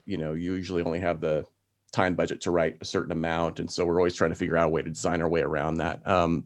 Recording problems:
none

